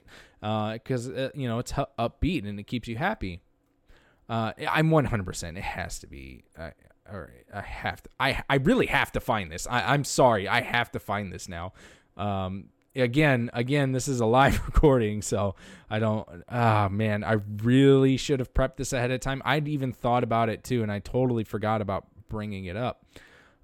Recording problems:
none

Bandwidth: 17.5 kHz